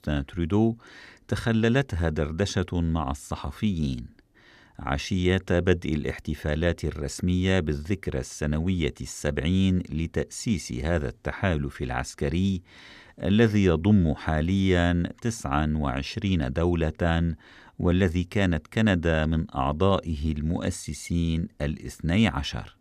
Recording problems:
none

